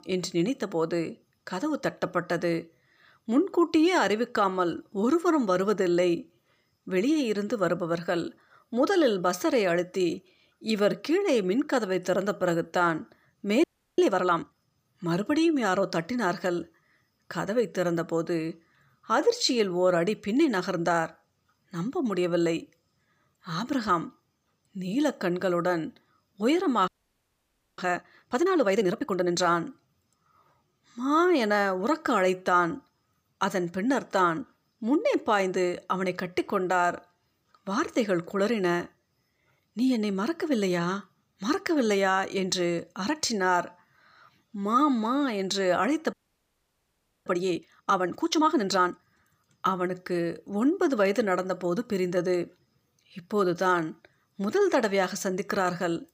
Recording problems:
audio freezing; at 14 s, at 27 s for 1 s and at 46 s for 1 s

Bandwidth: 15 kHz